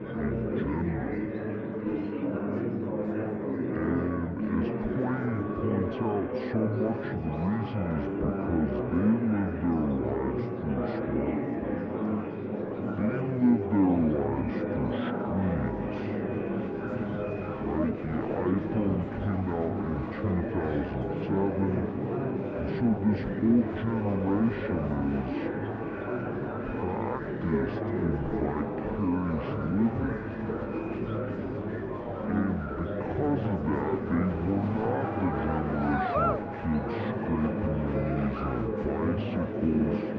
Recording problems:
muffled; very; fading above 1.5 kHz
wrong speed and pitch; too slow and too low; 0.5 times normal speed
echo of what is said; noticeable; throughout; 410 ms later, 15 dB below the speech
murmuring crowd; loud; throughout; 1 dB below the speech

